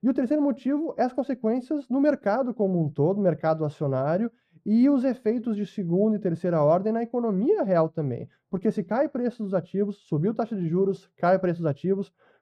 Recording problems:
muffled; very; fading above 1.5 kHz

